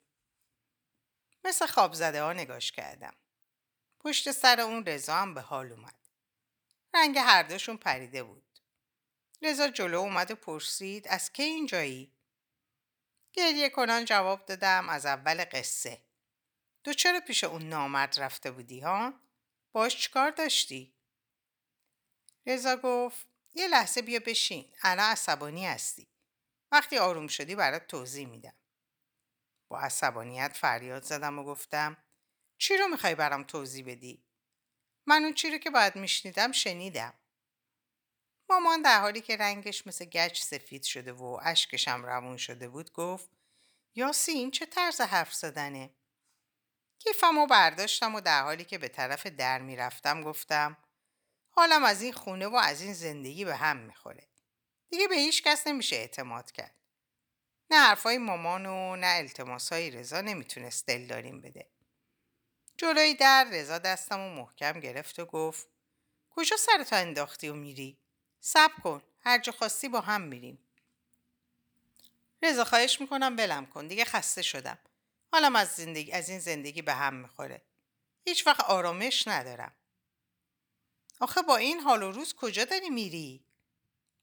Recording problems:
thin; somewhat; fading below 850 Hz

